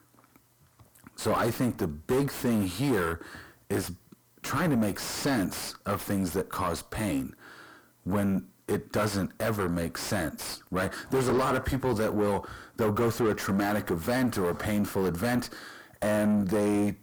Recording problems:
distortion; heavy; 5 dB below the speech

